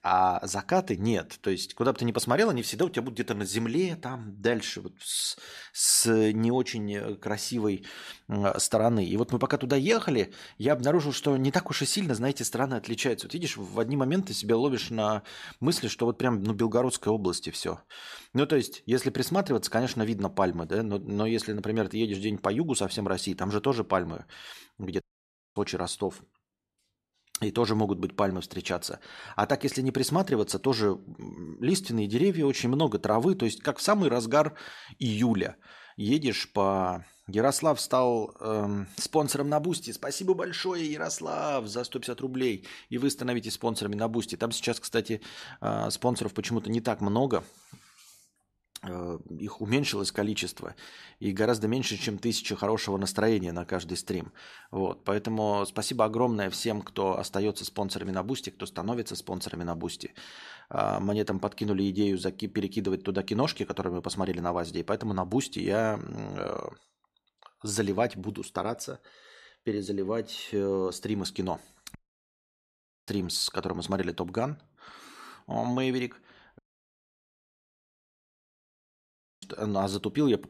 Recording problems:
audio cutting out; at 25 s for 0.5 s, at 1:12 for 1 s and at 1:17 for 3 s

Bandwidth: 14 kHz